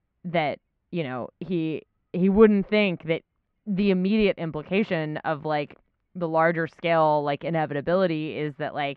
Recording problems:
muffled; very; fading above 2.5 kHz

